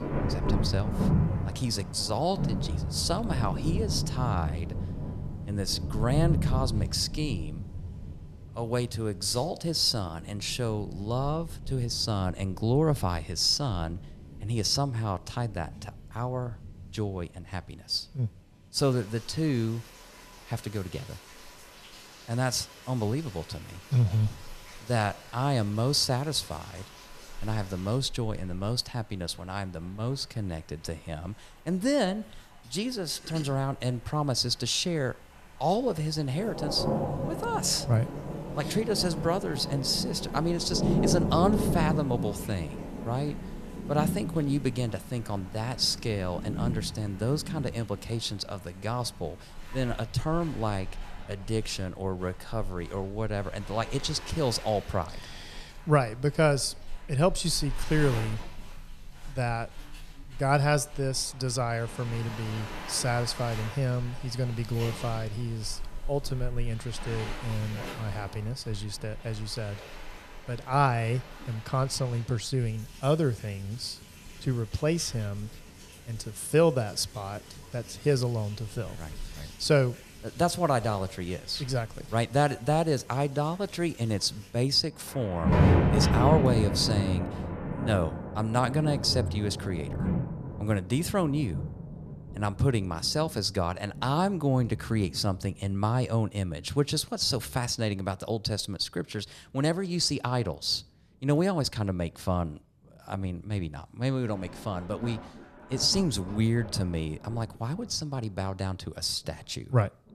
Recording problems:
rain or running water; loud; throughout; 5 dB below the speech

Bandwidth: 14.5 kHz